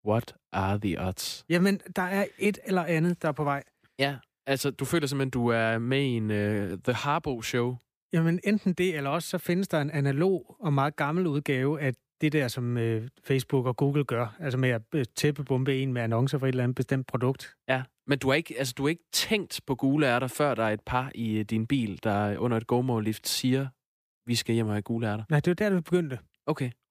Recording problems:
none

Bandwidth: 15 kHz